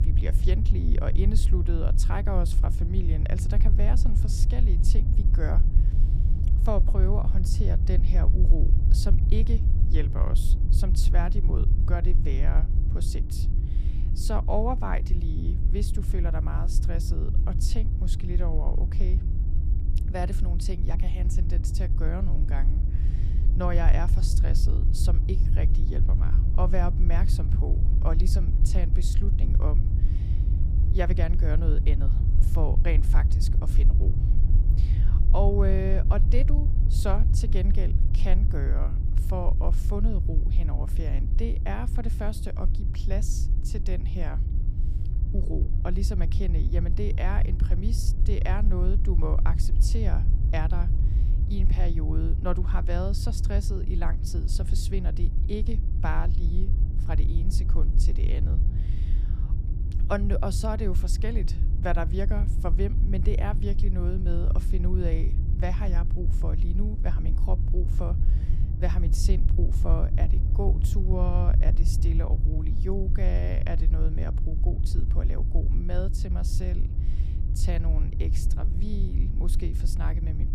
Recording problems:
low rumble; loud; throughout; 7 dB below the speech
electrical hum; noticeable; throughout; 60 Hz, 15 dB below the speech

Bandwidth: 15 kHz